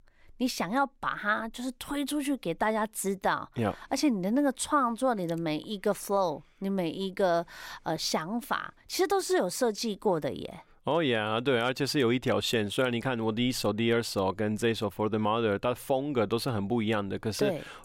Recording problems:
none

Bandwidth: 16 kHz